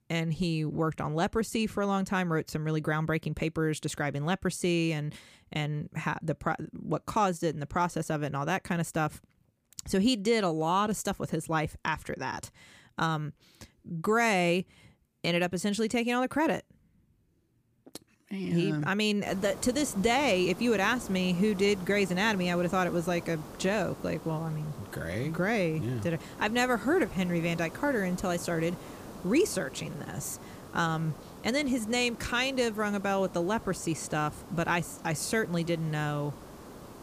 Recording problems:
hiss; noticeable; from 19 s on; 15 dB below the speech

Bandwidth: 15 kHz